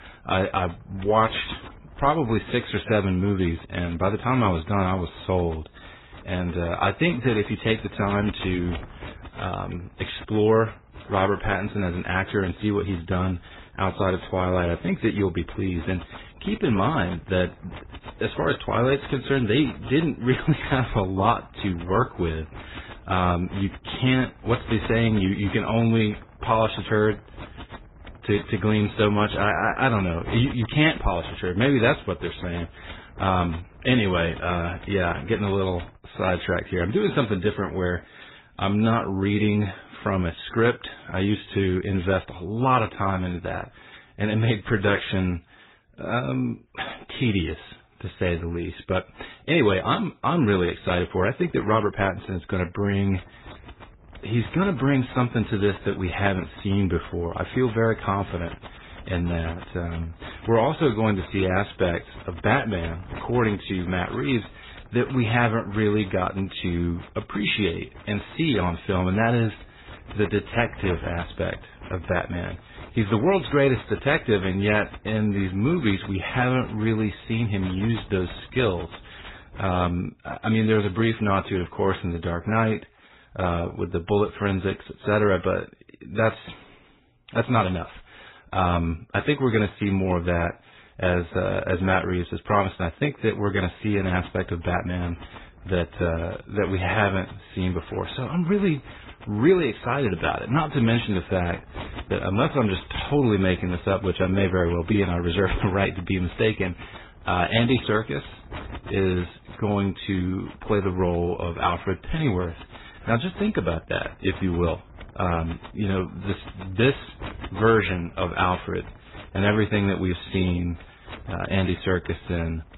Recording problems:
garbled, watery; badly; nothing above 4 kHz
wind noise on the microphone; occasional gusts; until 36 s, from 53 s to 1:20 and from 1:34 on; 20 dB below the speech

